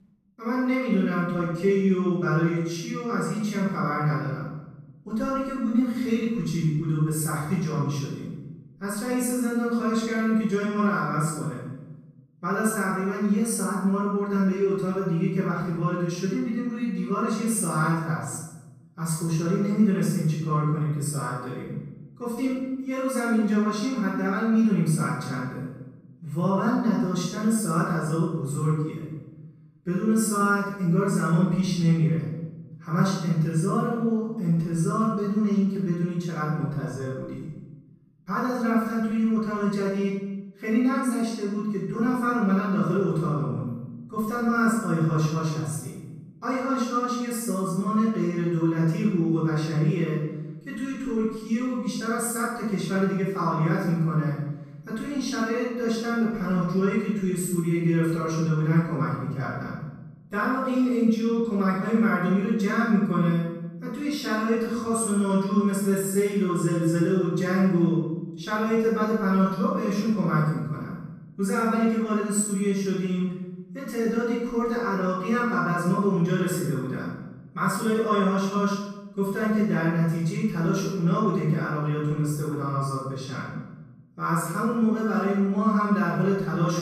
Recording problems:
room echo; strong; dies away in 0.9 s
off-mic speech; far

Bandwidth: 15 kHz